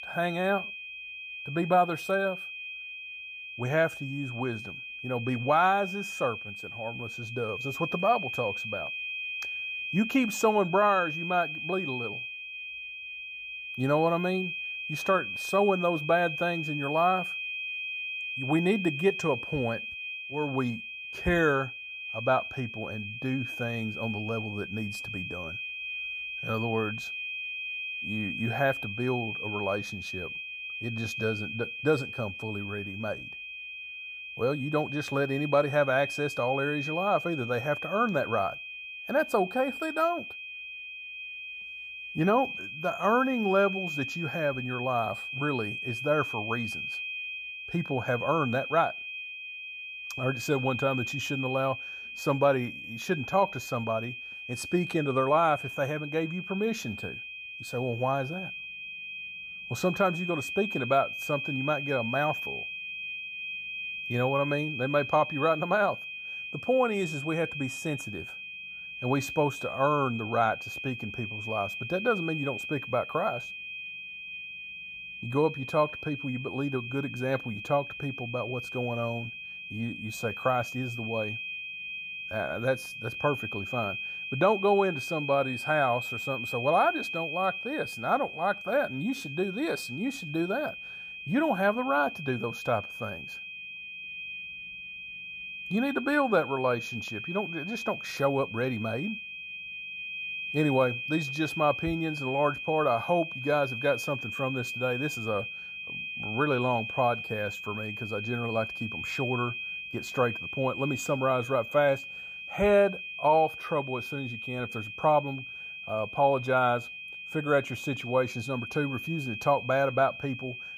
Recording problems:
high-pitched whine; loud; throughout; 2.5 kHz, 6 dB below the speech

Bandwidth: 15 kHz